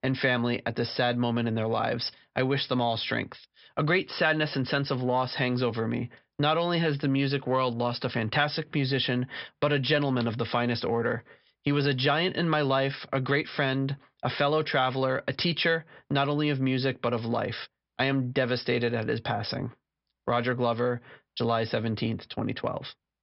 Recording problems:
high frequencies cut off; noticeable; nothing above 5.5 kHz

